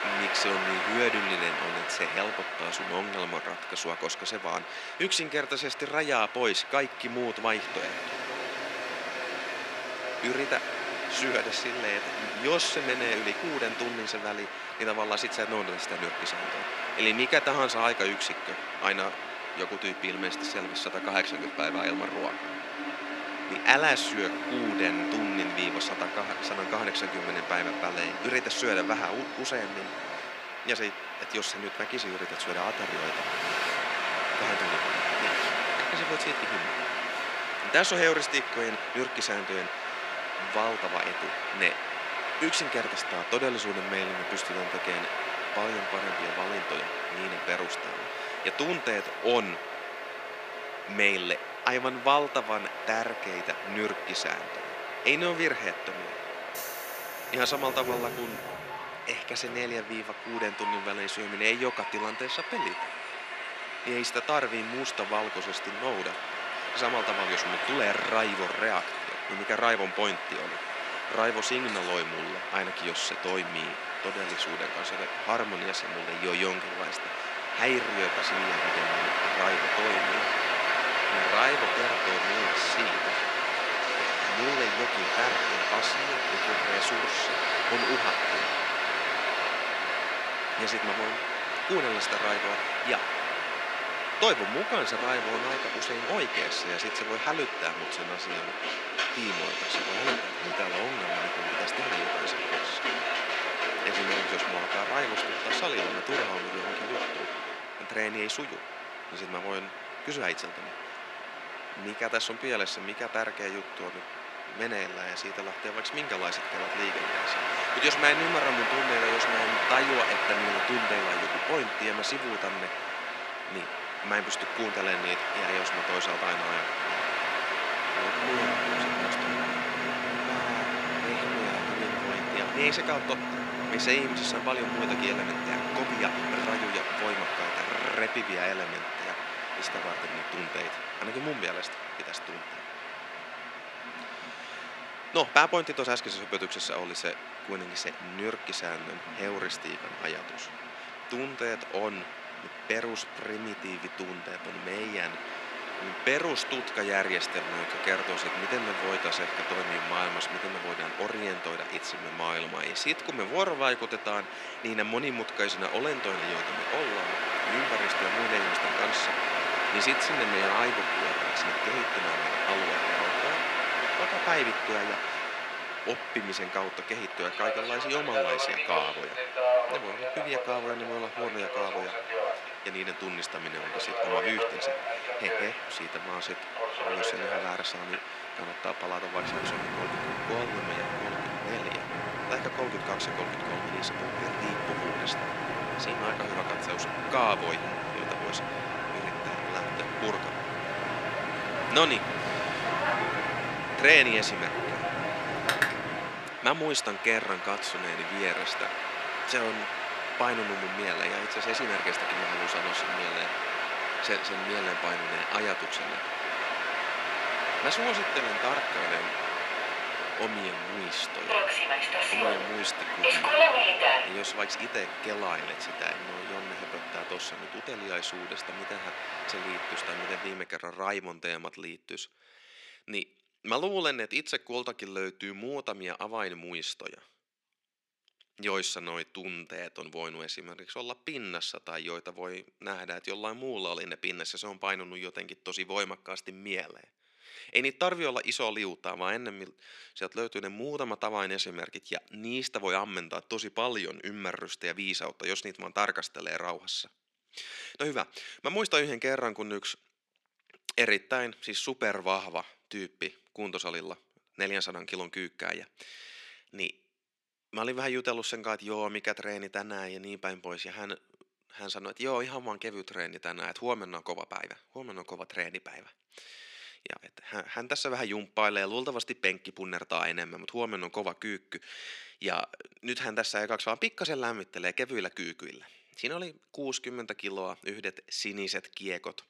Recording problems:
thin; very; fading below 450 Hz
train or aircraft noise; very loud; until 3:50; 1 dB above the speech

